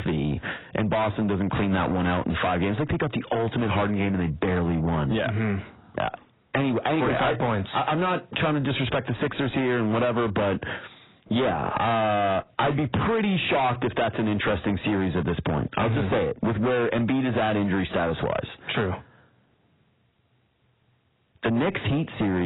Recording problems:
distortion; heavy; 6 dB below the speech
garbled, watery; badly; nothing above 4 kHz
squashed, flat; somewhat
abrupt cut into speech; at the end

